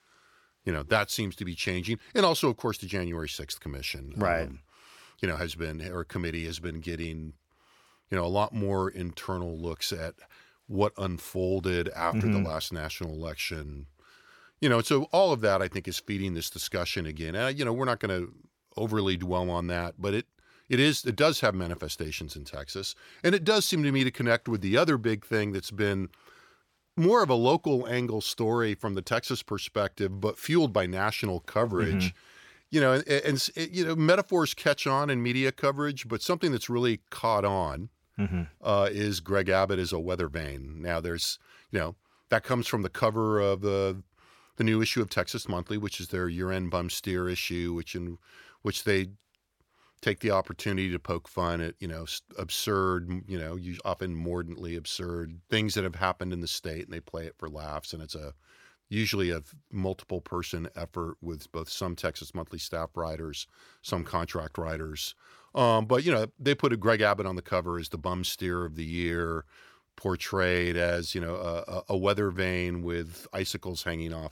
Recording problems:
none

